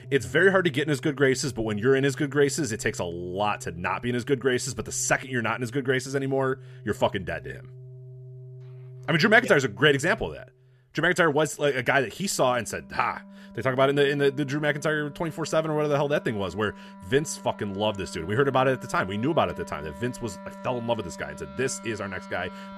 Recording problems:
background music; noticeable; throughout; 20 dB below the speech

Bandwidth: 13.5 kHz